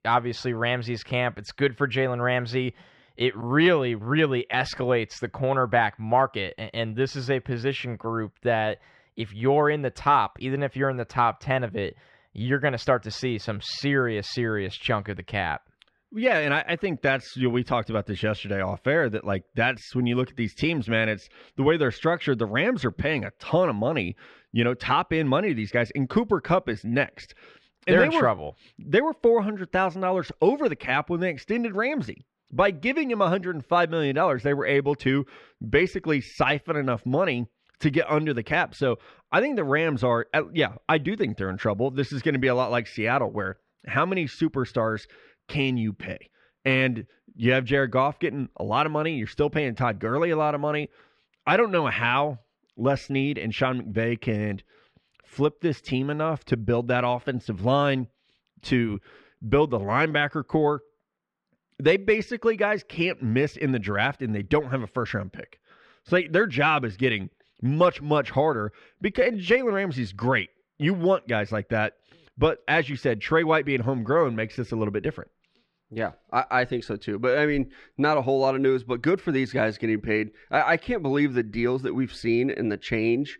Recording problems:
muffled; slightly; fading above 2.5 kHz

